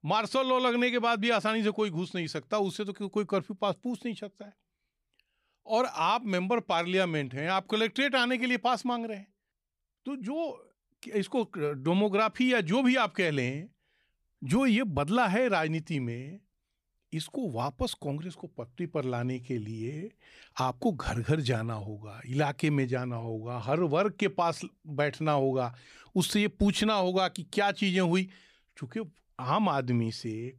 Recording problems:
none

